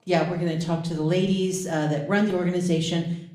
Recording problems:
room echo; slight; dies away in 0.5 s
off-mic speech; somewhat distant

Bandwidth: 15 kHz